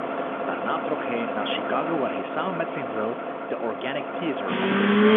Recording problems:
phone-call audio; nothing above 3.5 kHz
traffic noise; very loud; throughout; 3 dB above the speech

